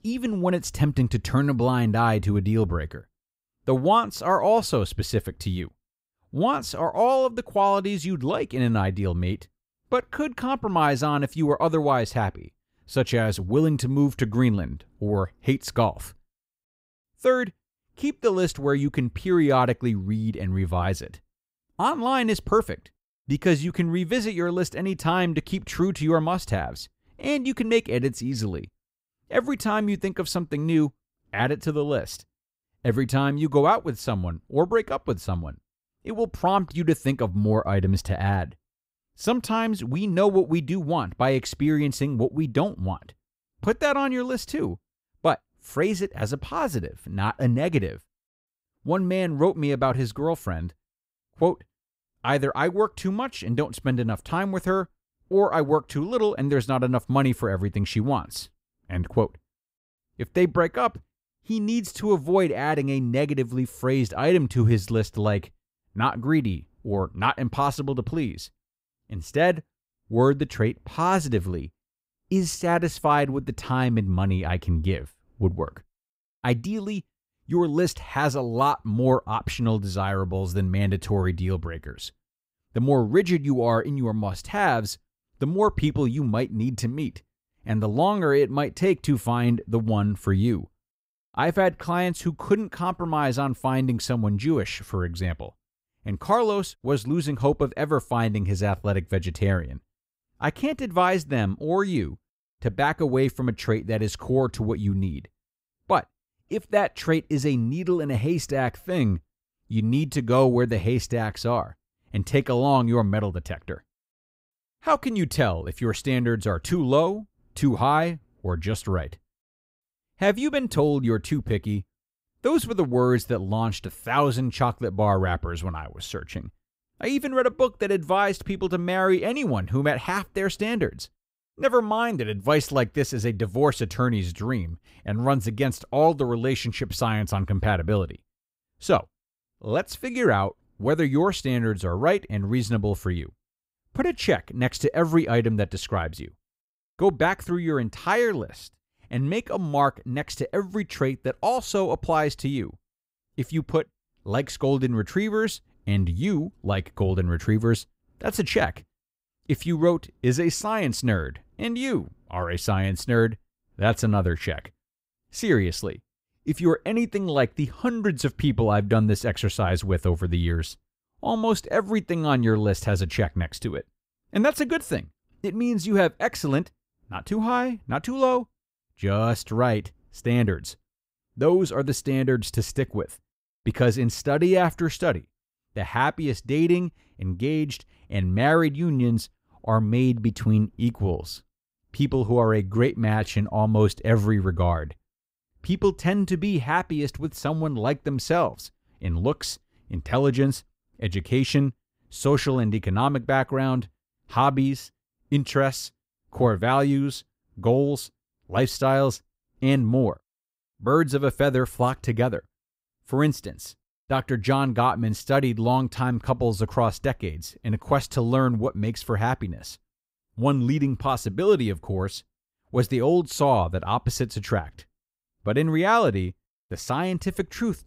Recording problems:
none

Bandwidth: 15.5 kHz